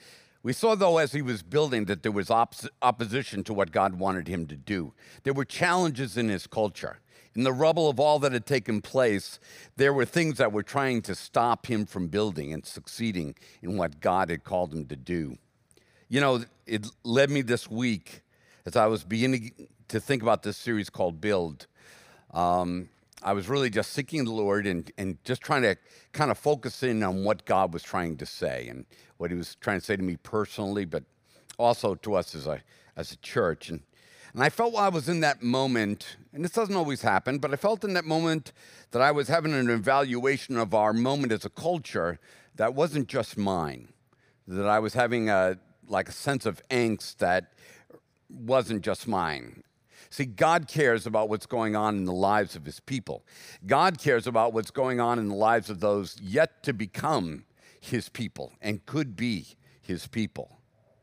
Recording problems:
none

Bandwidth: 15 kHz